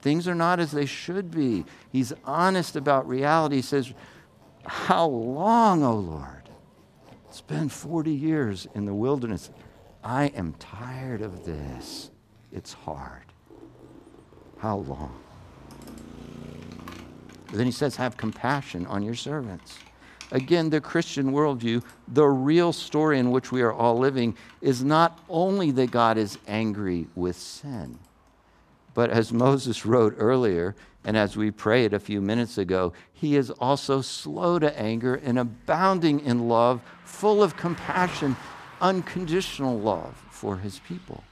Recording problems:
household noises; faint; throughout; 30 dB below the speech
traffic noise; faint; throughout; 25 dB below the speech

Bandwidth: 14.5 kHz